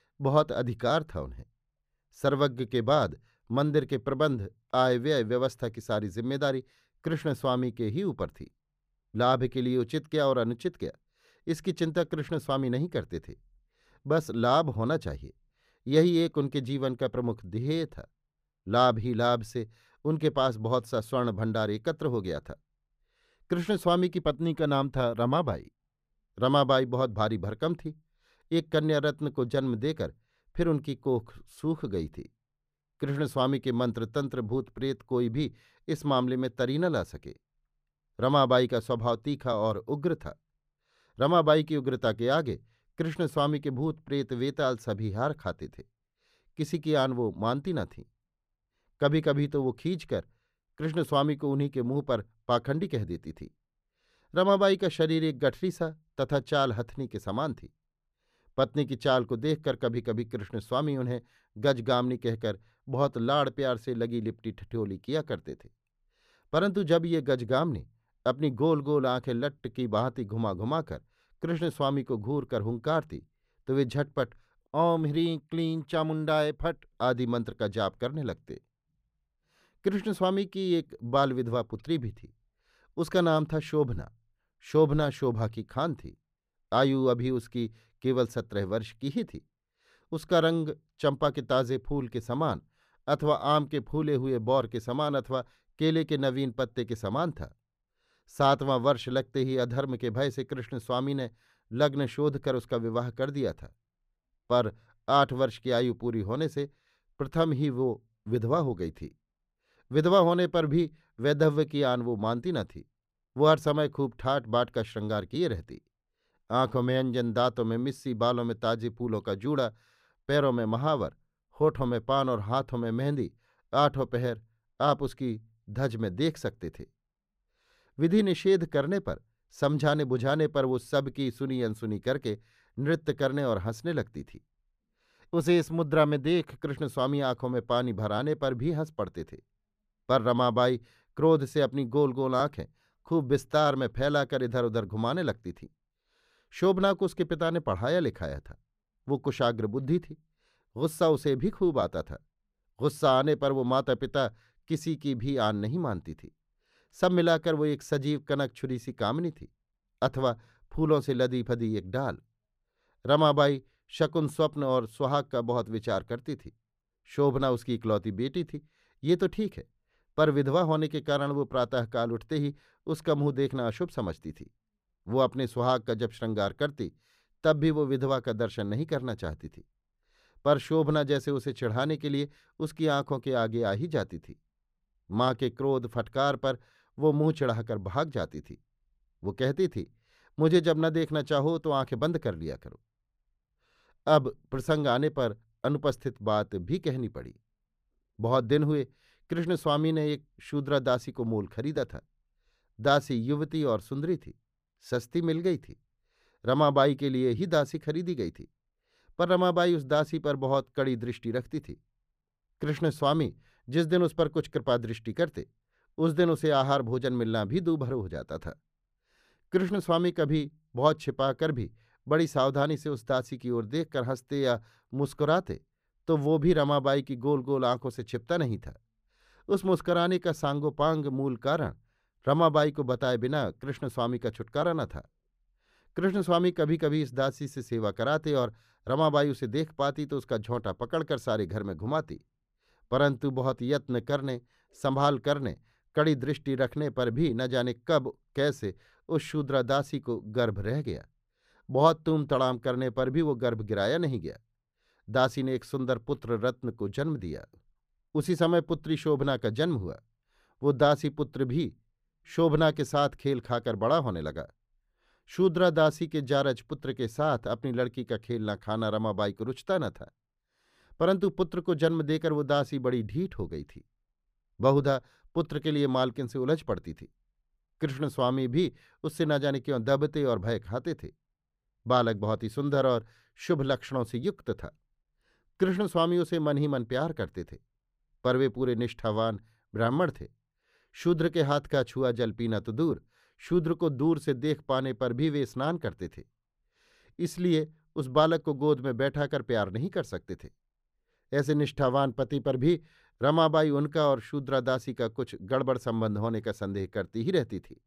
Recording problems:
muffled; slightly; fading above 3.5 kHz

